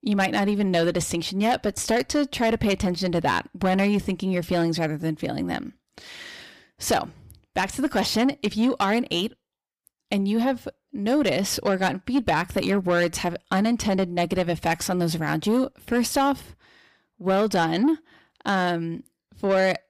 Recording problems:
distortion; slight; 10 dB below the speech

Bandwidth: 15 kHz